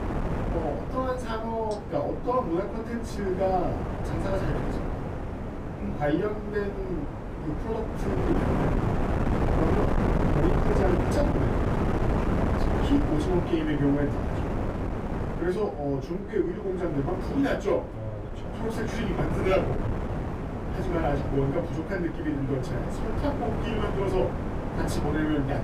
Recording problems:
off-mic speech; far
room echo; slight; dies away in 0.3 s
wind noise on the microphone; heavy; 3 dB below the speech

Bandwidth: 15 kHz